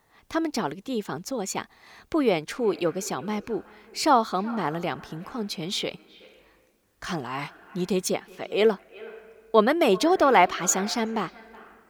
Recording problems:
echo of what is said; faint; from 2.5 s on; 370 ms later, 20 dB below the speech

